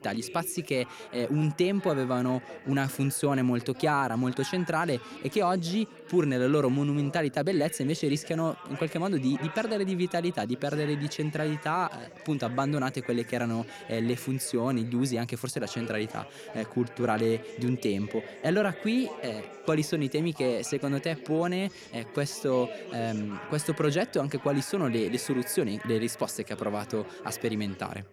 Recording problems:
background chatter; noticeable; throughout; 4 voices, 15 dB below the speech

